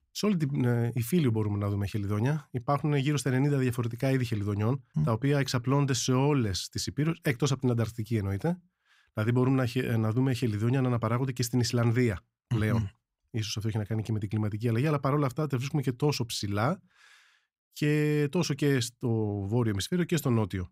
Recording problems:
none

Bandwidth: 15.5 kHz